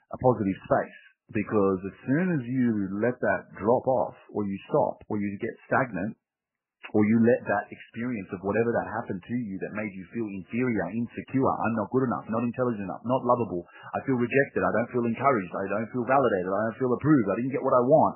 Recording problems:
garbled, watery; badly; nothing above 3 kHz

